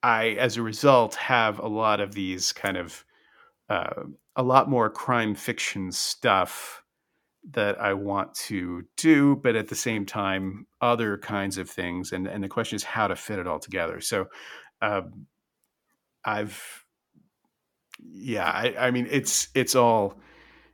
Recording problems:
none

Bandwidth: 18.5 kHz